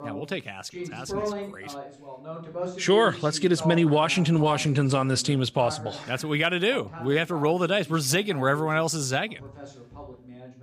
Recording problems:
voice in the background; noticeable; throughout; 15 dB below the speech

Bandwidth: 15 kHz